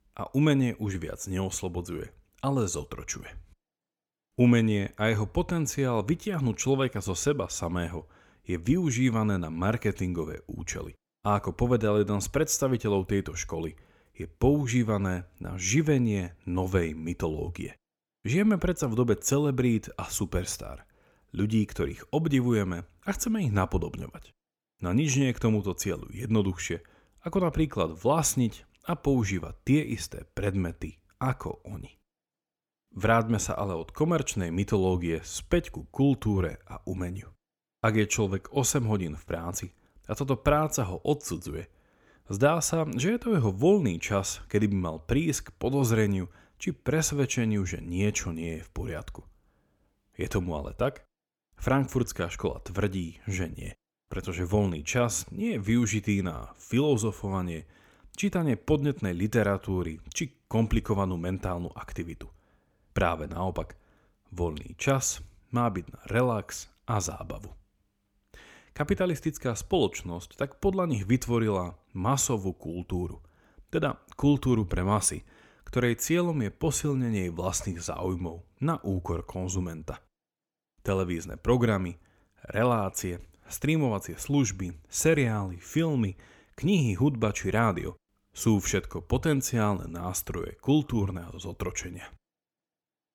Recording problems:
none

